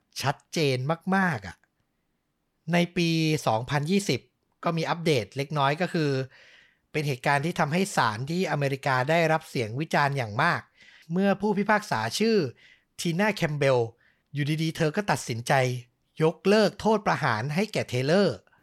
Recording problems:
none

